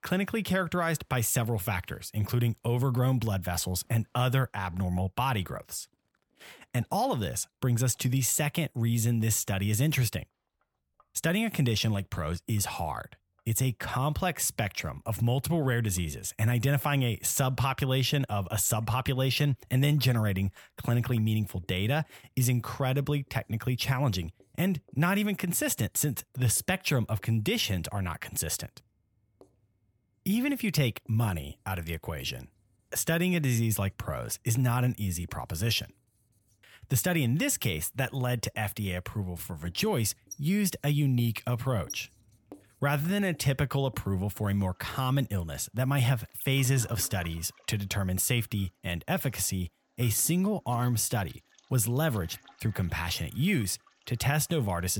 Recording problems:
household noises; faint; throughout; 25 dB below the speech
abrupt cut into speech; at the end

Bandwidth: 18.5 kHz